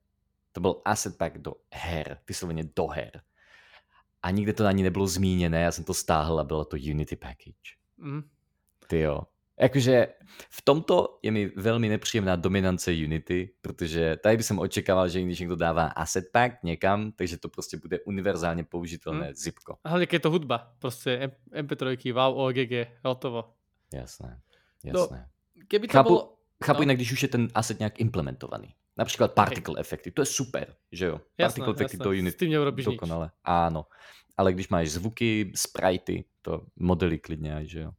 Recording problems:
none

